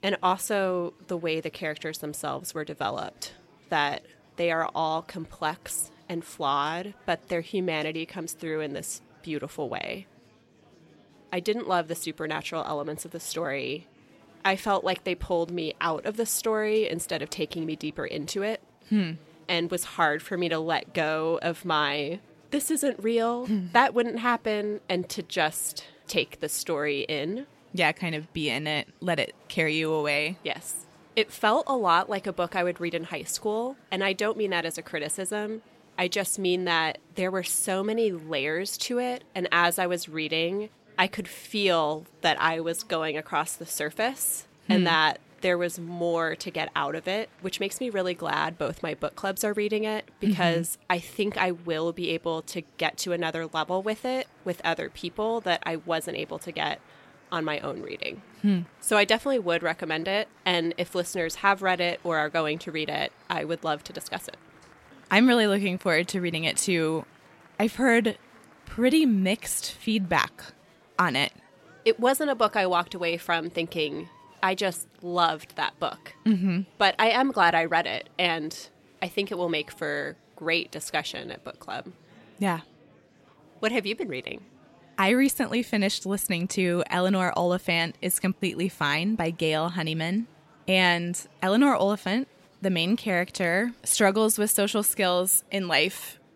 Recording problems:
murmuring crowd; faint; throughout; 30 dB below the speech

